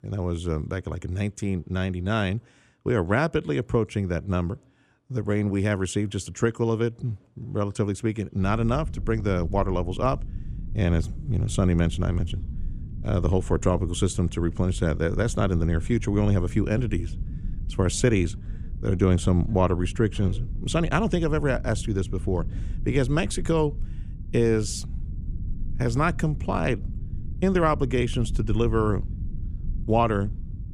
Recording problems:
low rumble; faint; from 8.5 s on; 20 dB below the speech

